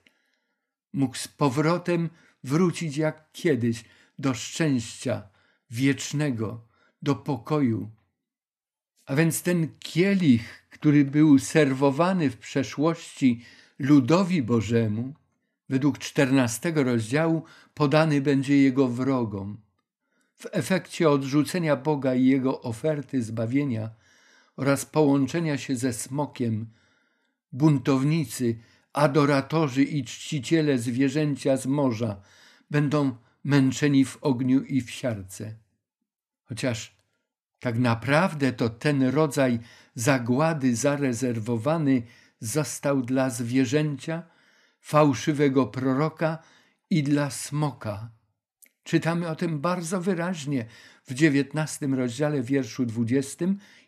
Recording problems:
none

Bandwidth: 14 kHz